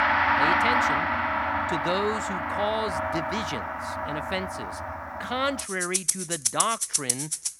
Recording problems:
background music; very loud; throughout; 5 dB above the speech

